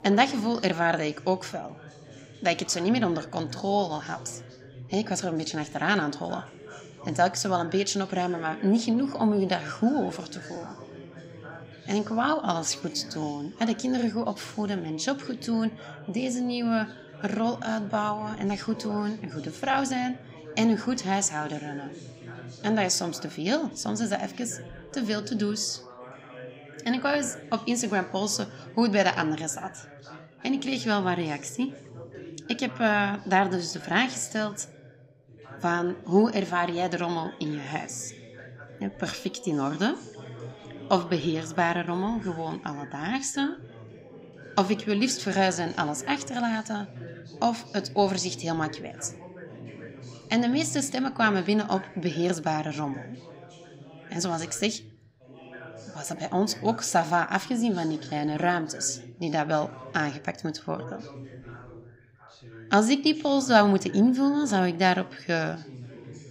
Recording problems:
background chatter; noticeable; throughout; 3 voices, 15 dB below the speech

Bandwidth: 15.5 kHz